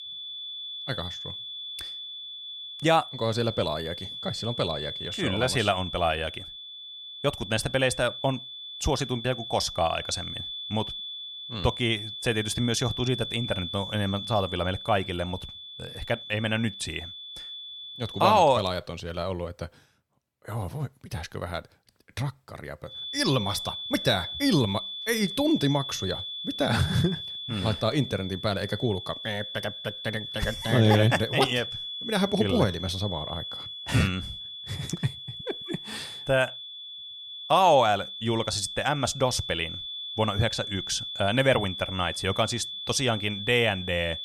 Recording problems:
high-pitched whine; loud; until 18 s and from 23 s on; 3.5 kHz, 8 dB below the speech

